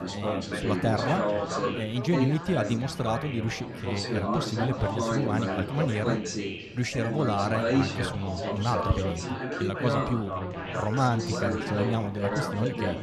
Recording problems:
chatter from many people; loud; throughout; 1 dB below the speech

